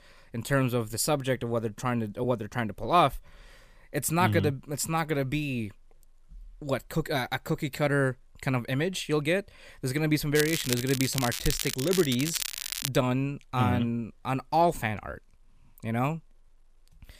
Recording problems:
crackling; loud; from 10 to 13 s; 4 dB below the speech

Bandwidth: 15 kHz